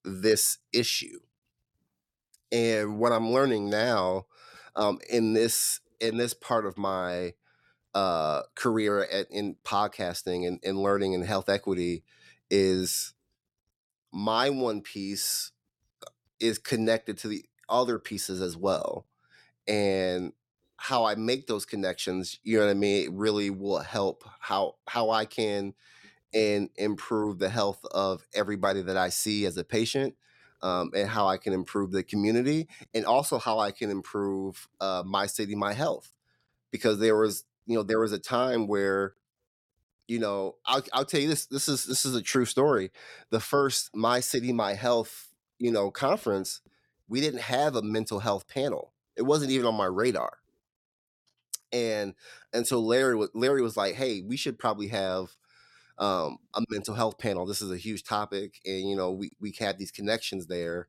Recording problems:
none

